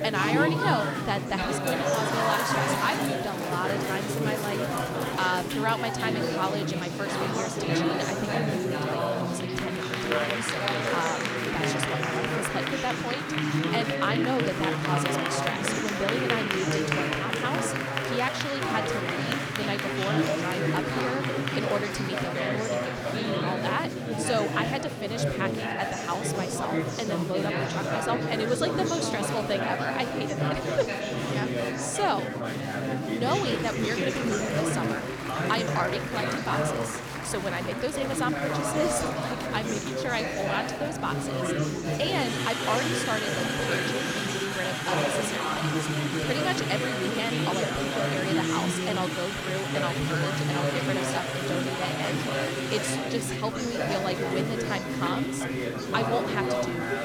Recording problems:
chatter from many people; very loud; throughout; 4 dB above the speech

